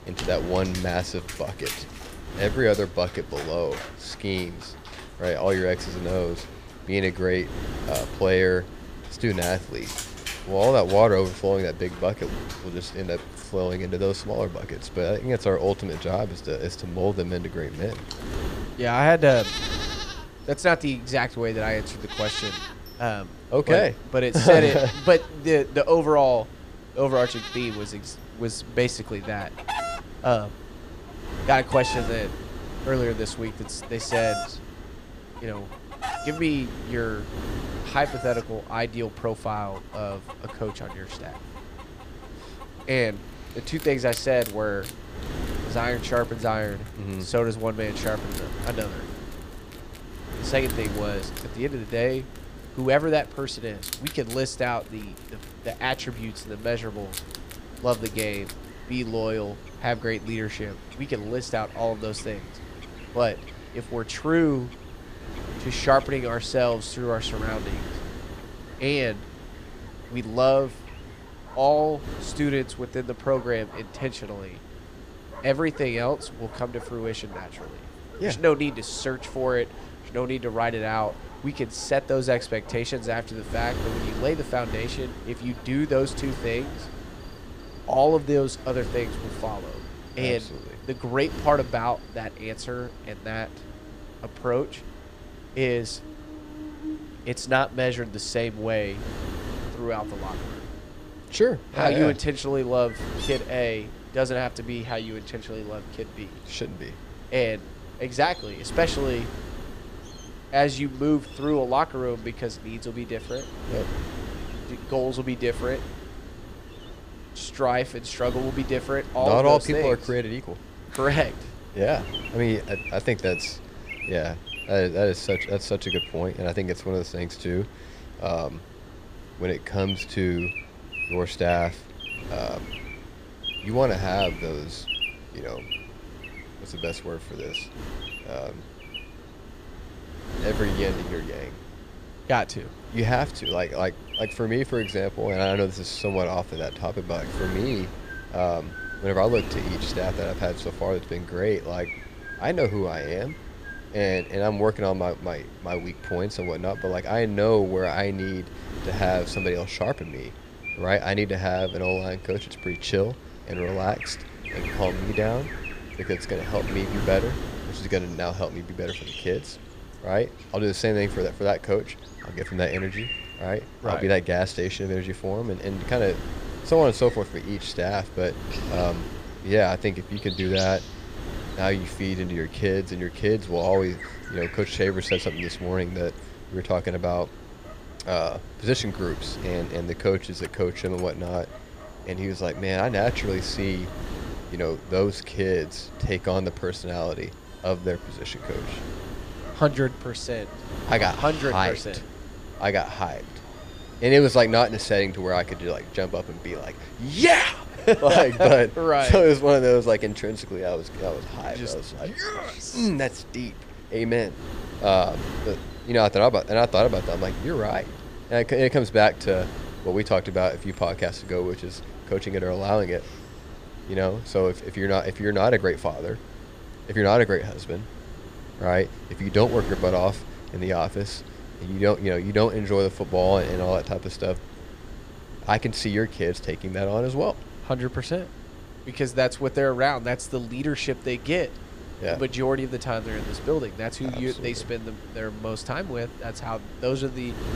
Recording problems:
animal sounds; noticeable; throughout; 15 dB below the speech
wind noise on the microphone; occasional gusts; 15 dB below the speech

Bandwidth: 15 kHz